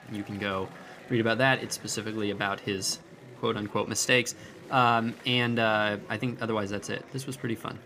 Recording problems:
murmuring crowd; noticeable; throughout; 20 dB below the speech

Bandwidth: 15 kHz